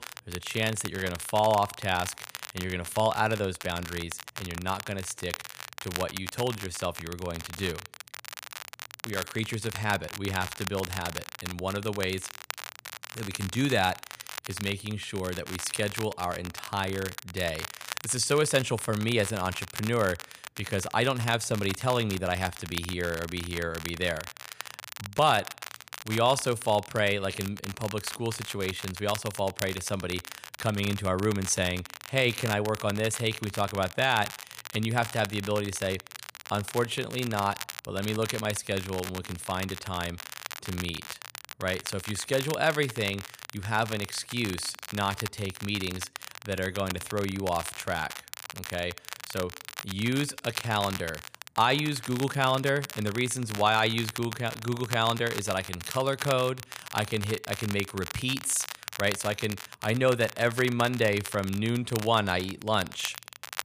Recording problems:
crackle, like an old record; noticeable; 10 dB below the speech

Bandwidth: 15 kHz